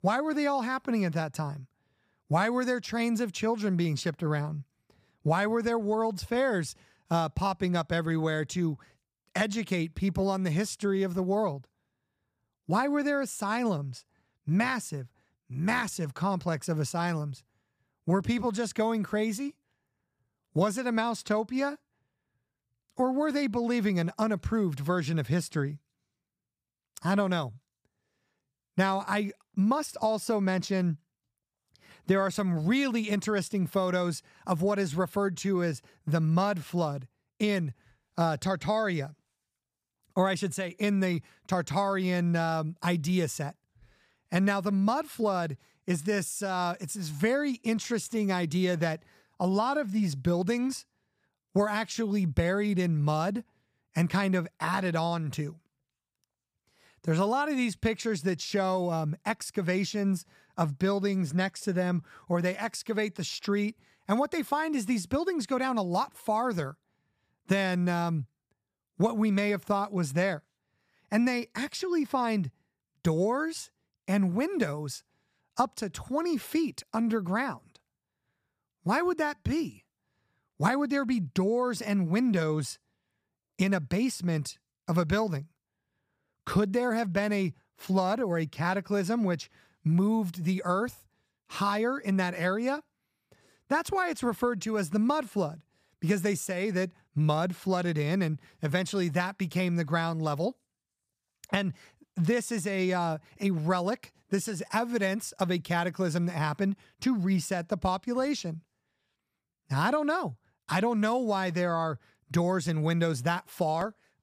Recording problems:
none

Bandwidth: 15 kHz